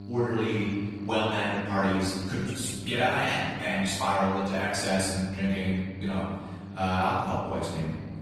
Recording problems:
room echo; strong; dies away in 1.5 s
off-mic speech; far
garbled, watery; slightly; nothing above 16 kHz
electrical hum; noticeable; throughout; 50 Hz, 20 dB below the speech

